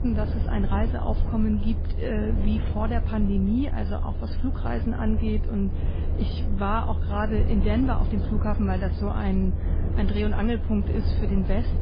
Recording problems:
garbled, watery; badly; nothing above 11.5 kHz
low rumble; loud; throughout; 9 dB below the speech

